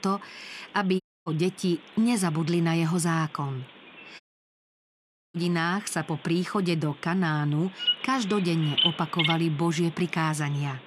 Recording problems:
animal sounds; very loud; throughout; as loud as the speech
audio cutting out; at 1 s and at 4 s for 1 s

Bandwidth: 14.5 kHz